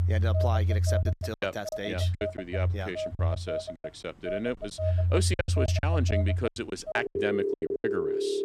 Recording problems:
alarms or sirens; very loud; throughout; 5 dB above the speech
choppy; very; from 1 to 2.5 s and from 3 to 8 s; 16% of the speech affected

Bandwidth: 15 kHz